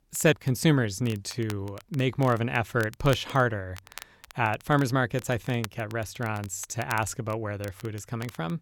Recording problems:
crackle, like an old record; noticeable; 20 dB below the speech

